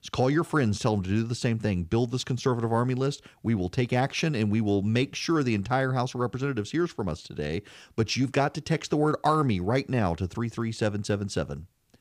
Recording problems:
none

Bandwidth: 15 kHz